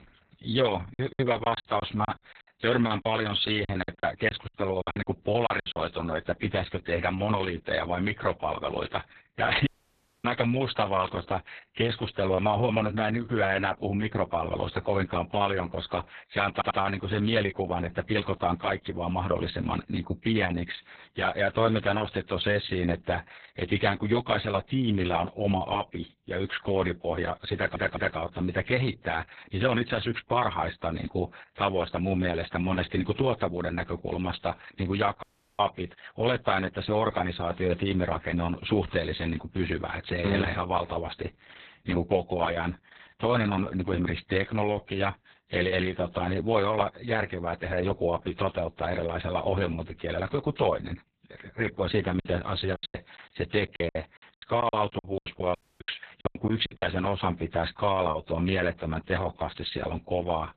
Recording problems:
garbled, watery; badly; nothing above 4 kHz
choppy; very; from 1 to 6 s and from 52 to 57 s; 21% of the speech affected
audio cutting out; at 9.5 s for 0.5 s, at 35 s and at 56 s
audio stuttering; at 17 s and at 28 s

